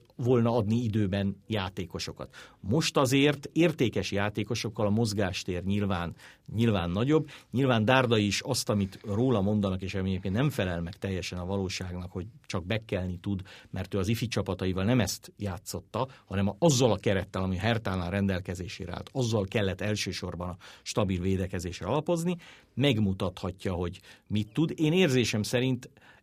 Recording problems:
none

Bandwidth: 15 kHz